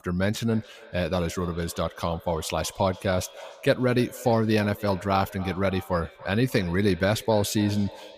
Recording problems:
echo of what is said; noticeable; throughout; 290 ms later, 20 dB below the speech

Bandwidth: 15 kHz